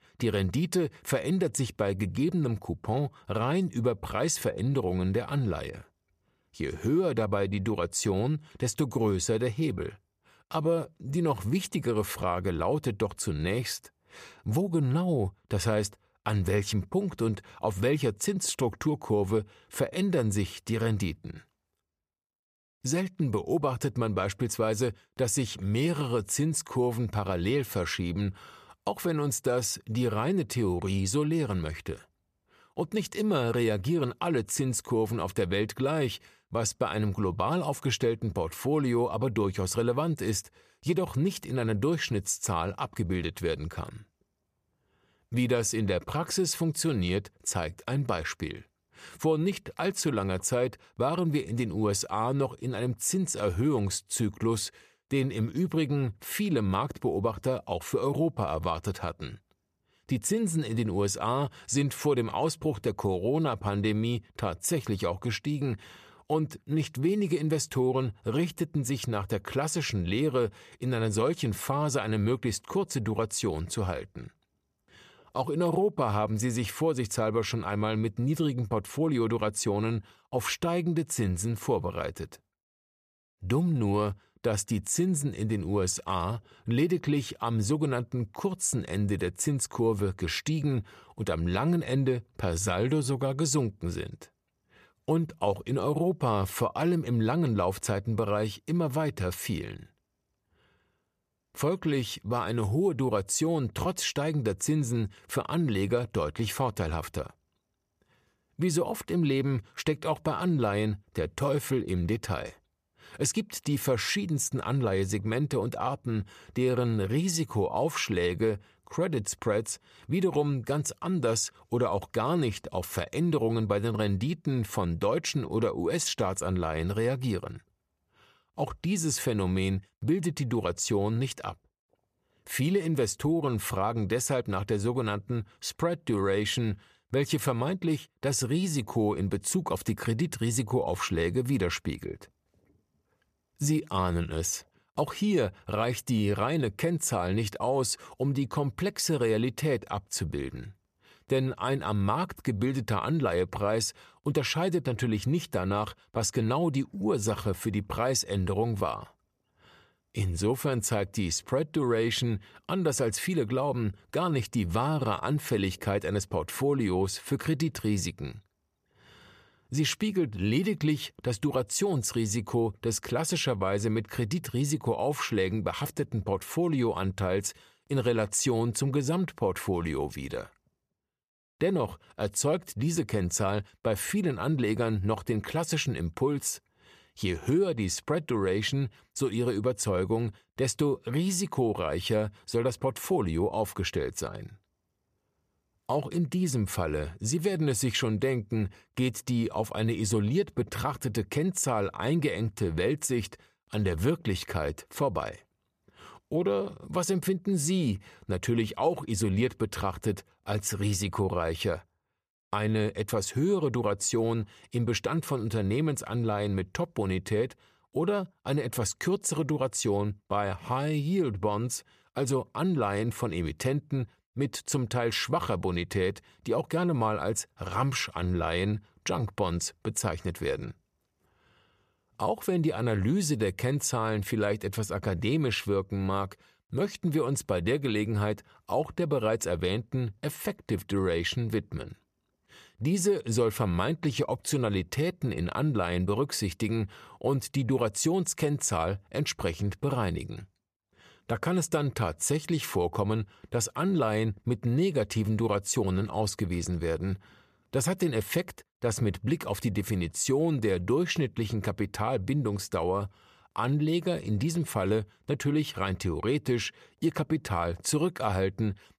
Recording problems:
none

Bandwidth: 14.5 kHz